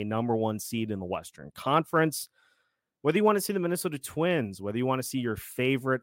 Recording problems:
abrupt cut into speech; at the start

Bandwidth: 16 kHz